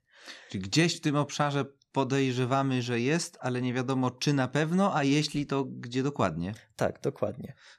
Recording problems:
none

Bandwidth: 14.5 kHz